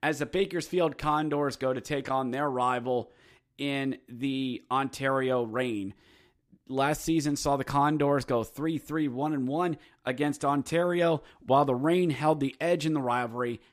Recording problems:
none

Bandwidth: 15 kHz